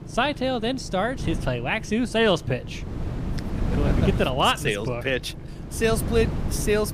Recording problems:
wind noise on the microphone; occasional gusts; 15 dB below the speech
low rumble; faint; throughout; 25 dB below the speech

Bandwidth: 15 kHz